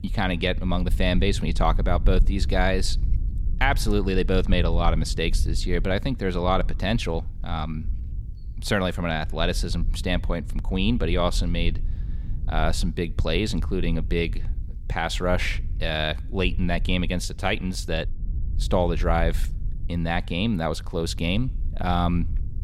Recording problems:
low rumble; faint; throughout; 20 dB below the speech

